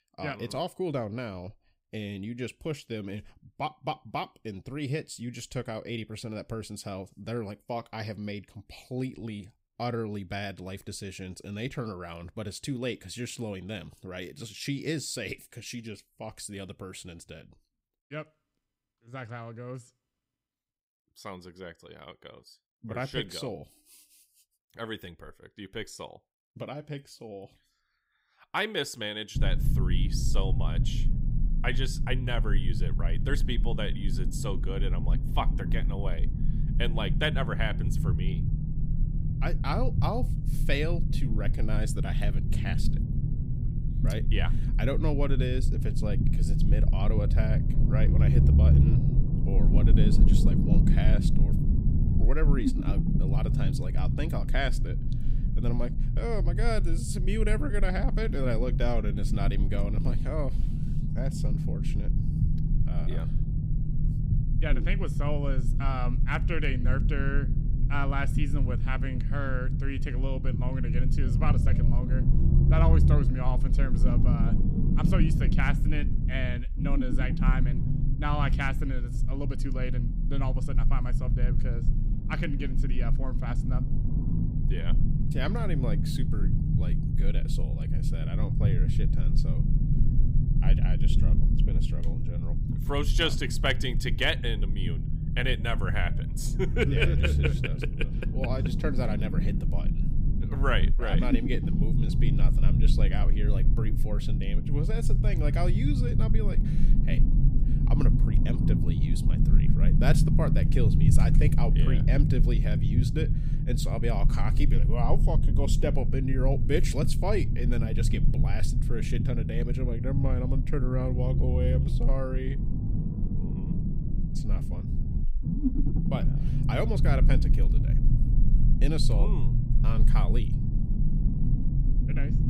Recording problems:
low rumble; loud; from 29 s on; 5 dB below the speech

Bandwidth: 15.5 kHz